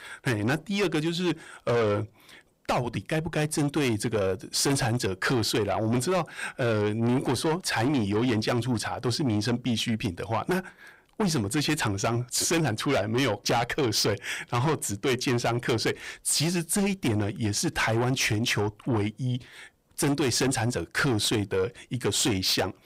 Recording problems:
distortion; heavy; 7 dB below the speech

